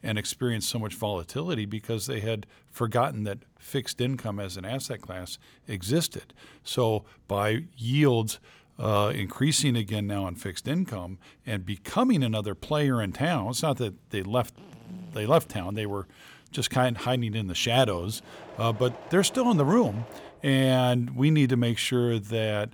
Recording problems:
machinery noise; faint; from 13 s on; 20 dB below the speech

